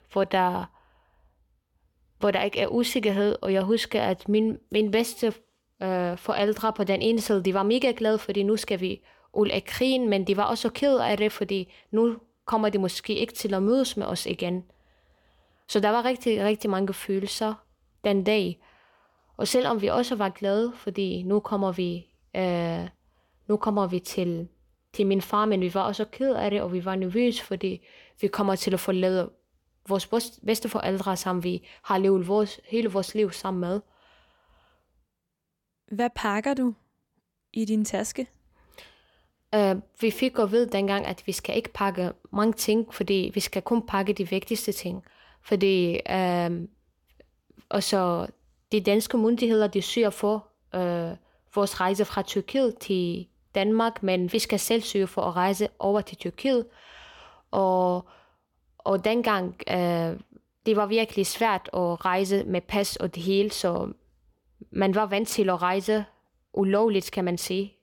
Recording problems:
none

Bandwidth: 18 kHz